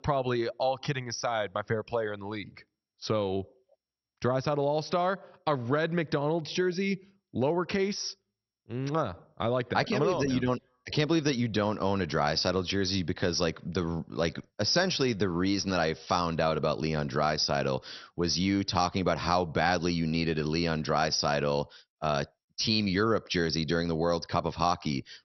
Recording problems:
garbled, watery; slightly; nothing above 6 kHz

